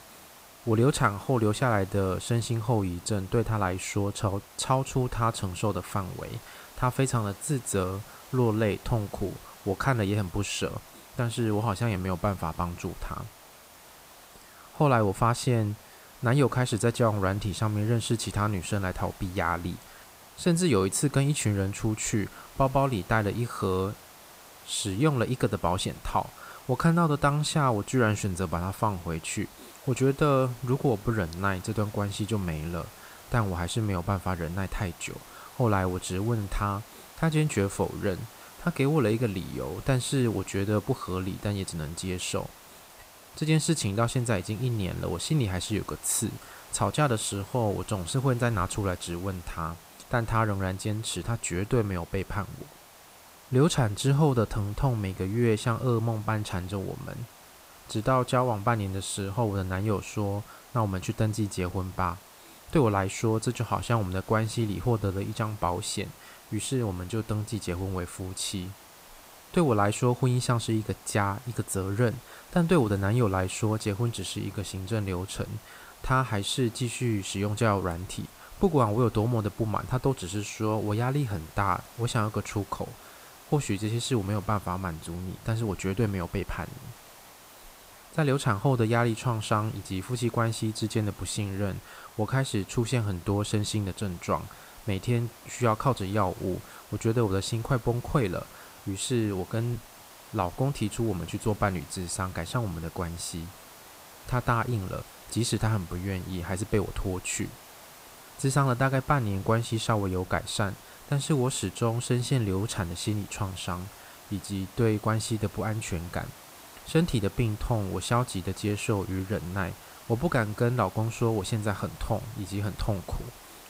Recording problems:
hiss; noticeable; throughout; 20 dB below the speech

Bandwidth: 15.5 kHz